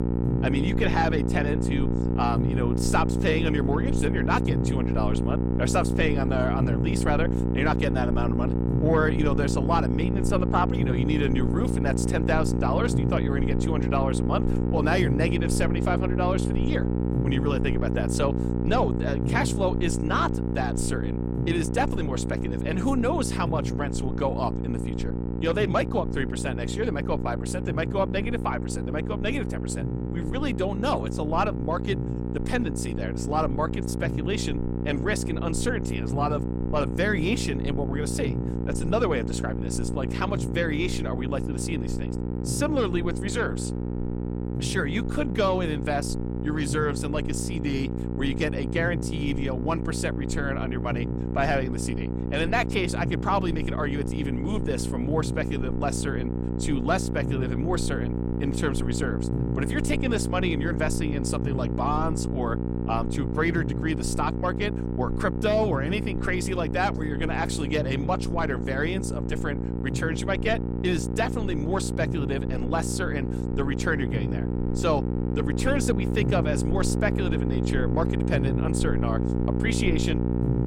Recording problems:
electrical hum; loud; throughout; 60 Hz, 5 dB below the speech

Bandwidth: 16.5 kHz